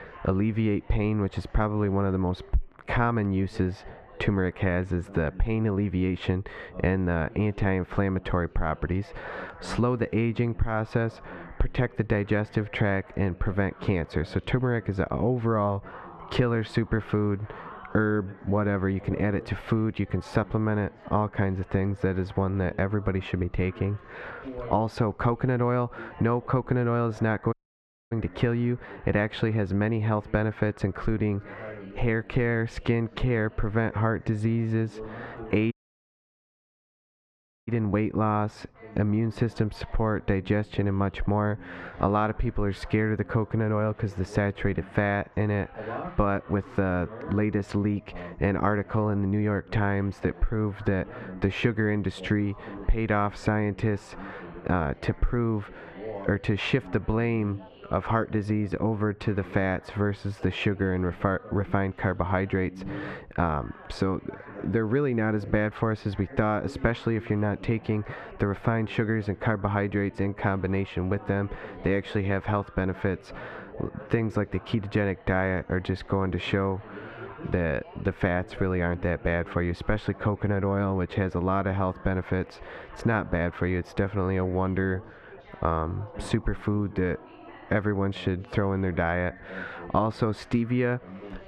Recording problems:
muffled; slightly; fading above 1.5 kHz
squashed, flat; somewhat, background pumping
background chatter; noticeable; throughout; 3 voices, 20 dB below the speech
audio cutting out; at 28 s for 0.5 s and at 36 s for 2 s

